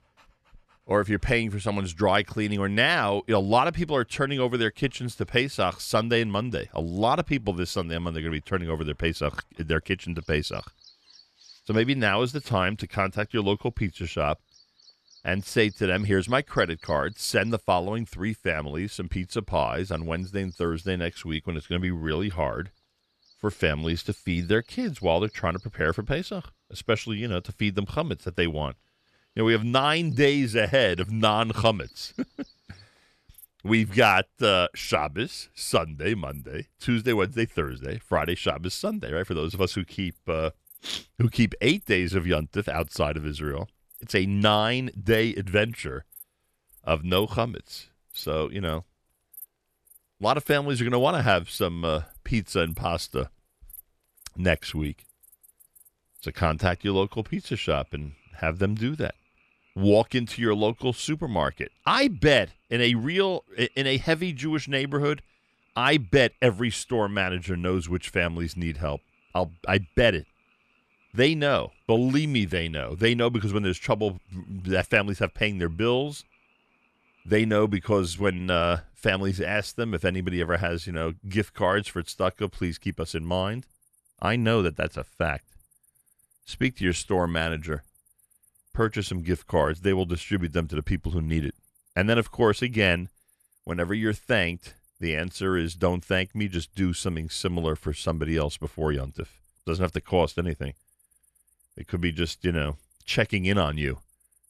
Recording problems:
animal sounds; faint; throughout; 30 dB below the speech

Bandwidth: 13.5 kHz